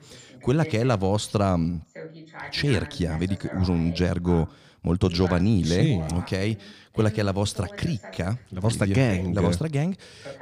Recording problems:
voice in the background; noticeable; throughout; 15 dB below the speech

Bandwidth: 15 kHz